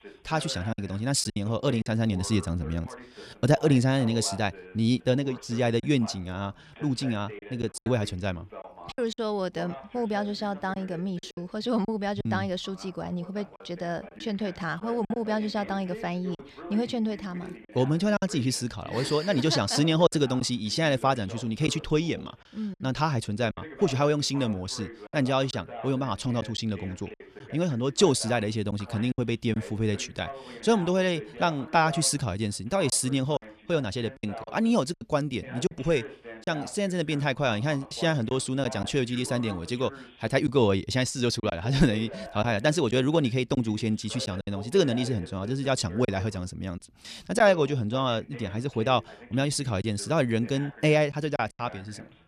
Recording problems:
voice in the background; noticeable; throughout; 15 dB below the speech
choppy; occasionally; 4% of the speech affected

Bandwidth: 14.5 kHz